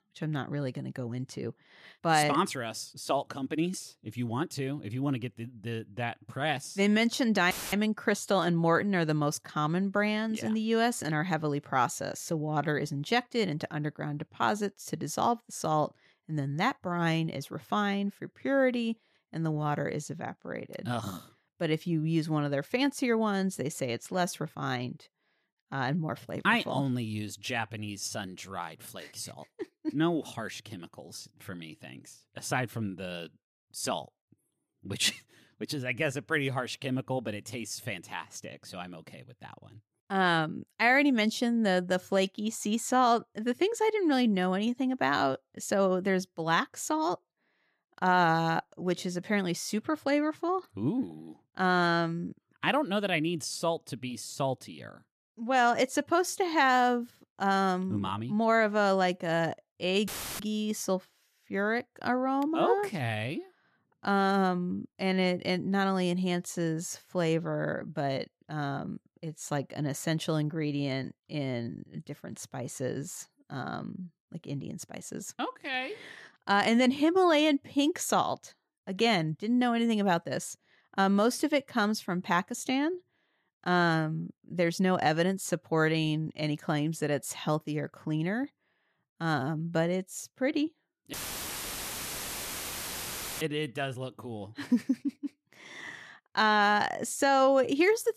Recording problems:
audio cutting out; filled with static; at 7.5 s, at 1:00 and at 1:31 for 2.5 s

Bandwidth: 14 kHz